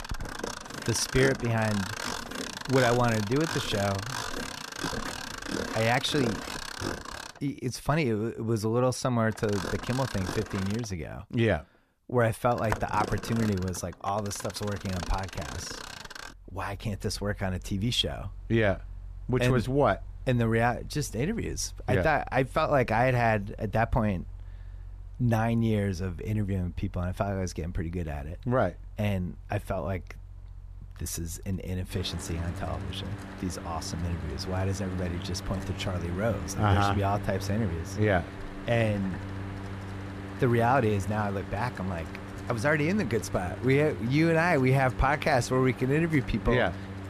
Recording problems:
machinery noise; noticeable; throughout; 10 dB below the speech

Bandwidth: 14.5 kHz